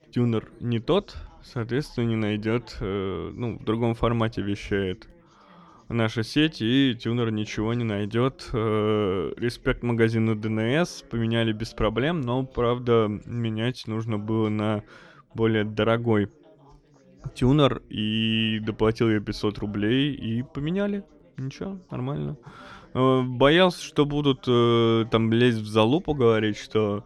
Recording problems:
background chatter; faint; throughout; 2 voices, 30 dB below the speech

